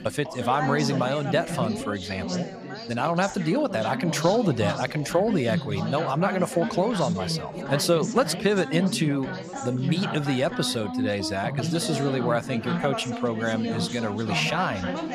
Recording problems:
background chatter; loud; throughout; 4 voices, 5 dB below the speech

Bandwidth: 15.5 kHz